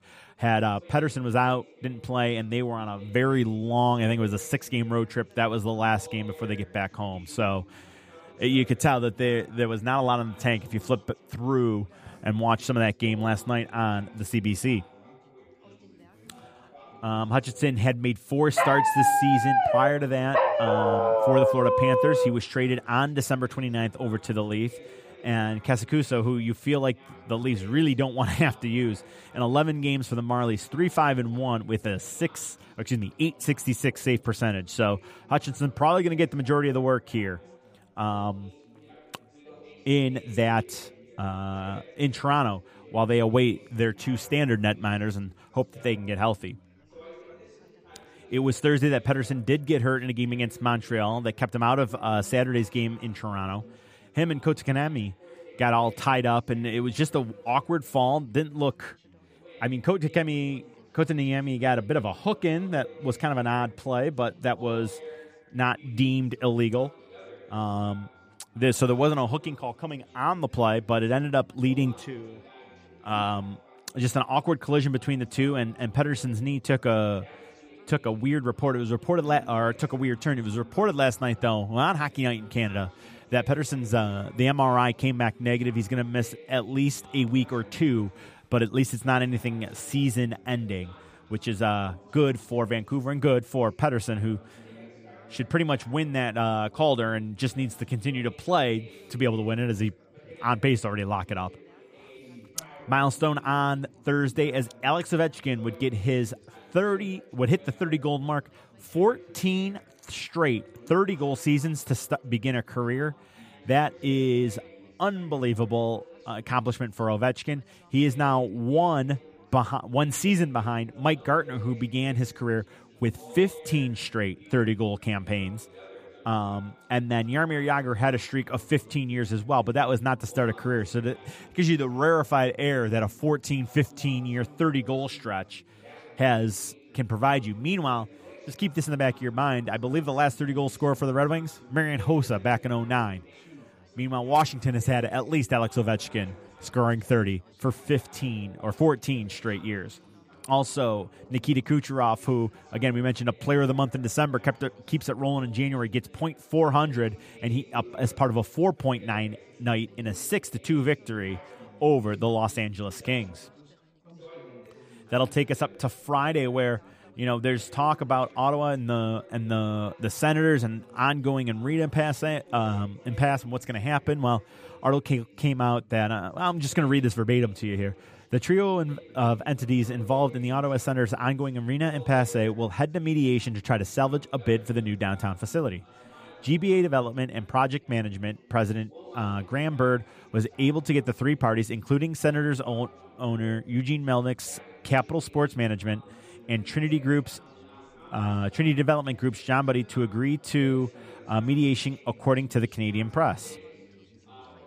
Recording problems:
background chatter; faint; throughout; 4 voices, 25 dB below the speech
dog barking; loud; from 19 to 22 s; peak 5 dB above the speech

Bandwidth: 15 kHz